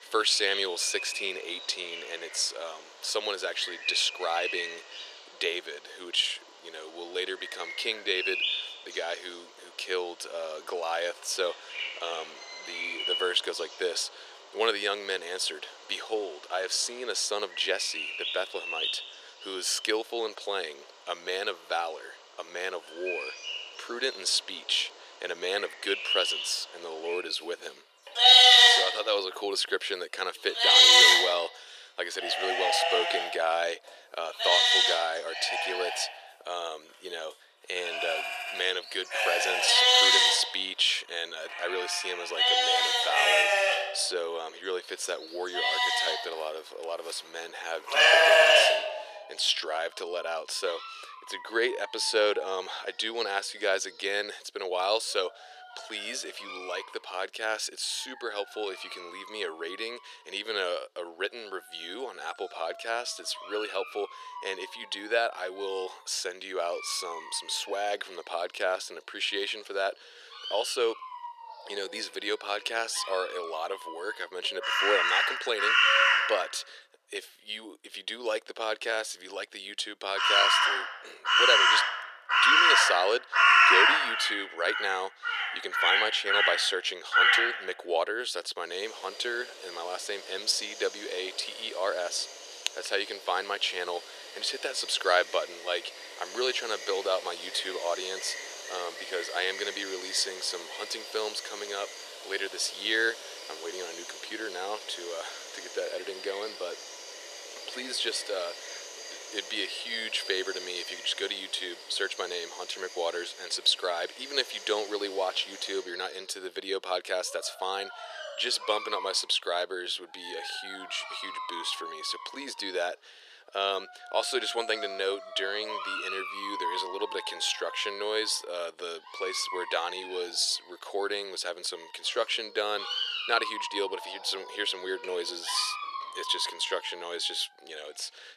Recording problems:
thin; very; fading below 400 Hz
animal sounds; very loud; throughout; 8 dB above the speech

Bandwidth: 14 kHz